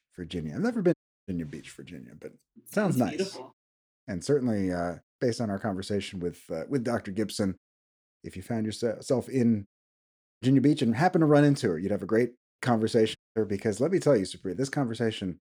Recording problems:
audio cutting out; at 1 s, at 10 s and at 13 s

